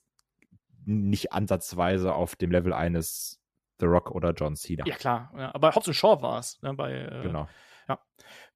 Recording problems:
uneven, jittery; strongly; from 1 to 8 s

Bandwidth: 14.5 kHz